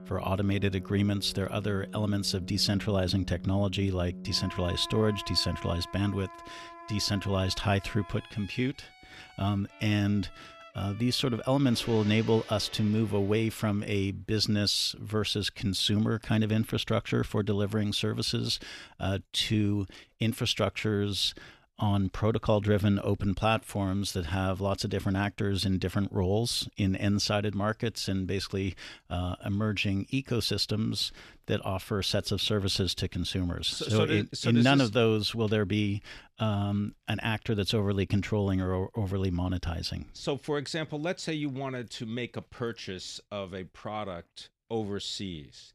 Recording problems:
background music; noticeable; until 14 s; 15 dB below the speech

